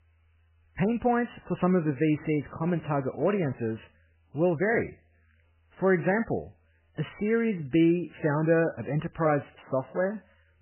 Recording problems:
garbled, watery; badly; nothing above 3 kHz

